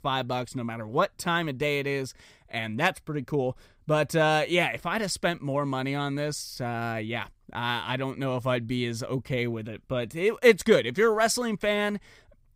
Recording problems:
none

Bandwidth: 15.5 kHz